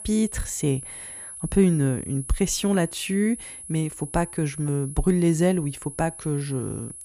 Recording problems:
high-pitched whine; noticeable; throughout; 10.5 kHz, 10 dB below the speech

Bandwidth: 15 kHz